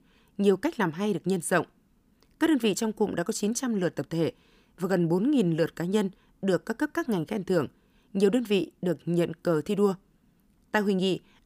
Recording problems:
none

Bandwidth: 15 kHz